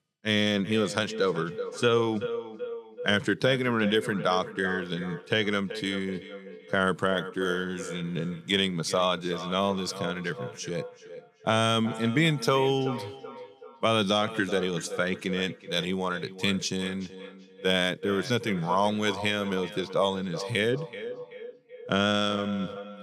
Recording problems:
echo of what is said; noticeable; throughout; 380 ms later, 10 dB below the speech

